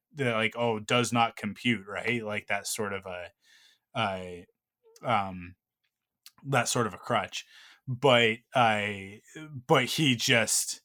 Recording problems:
none

